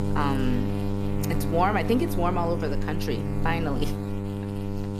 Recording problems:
electrical hum; loud; throughout; 50 Hz, 7 dB below the speech

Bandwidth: 14.5 kHz